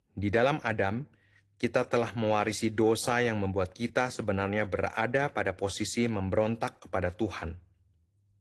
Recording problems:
garbled, watery; slightly

